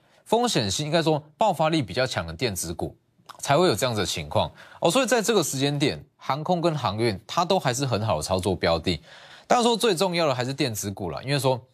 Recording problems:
none

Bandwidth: 14.5 kHz